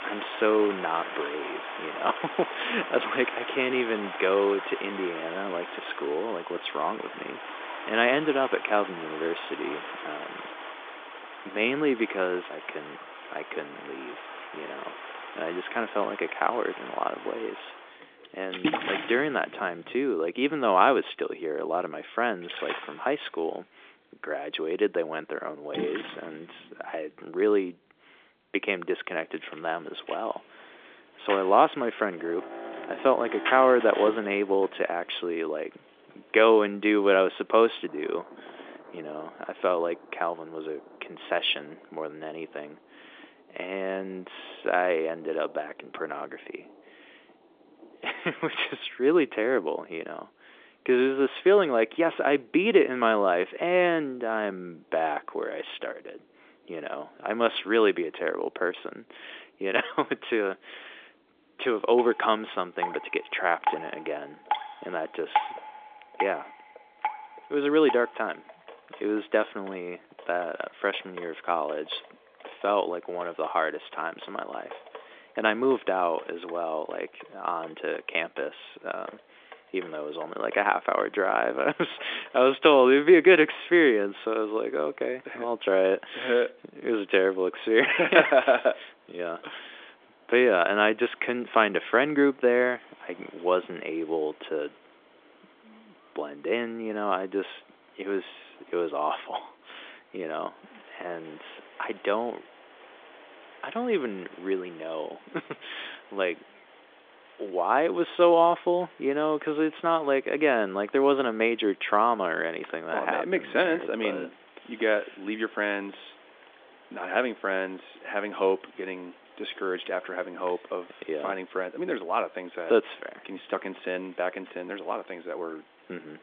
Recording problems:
phone-call audio; nothing above 3.5 kHz
rain or running water; noticeable; throughout; 10 dB below the speech

